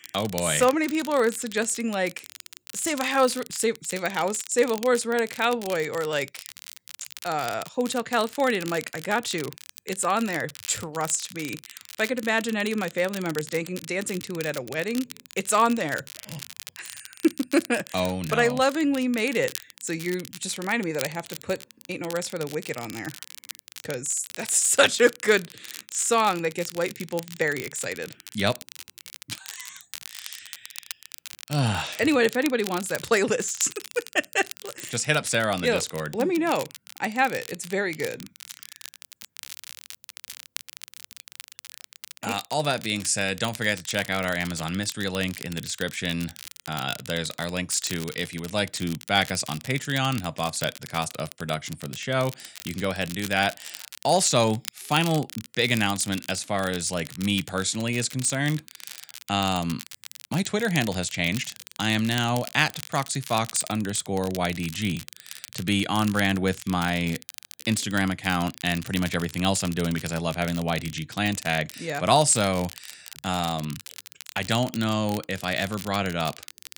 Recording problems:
crackle, like an old record; noticeable; 15 dB below the speech

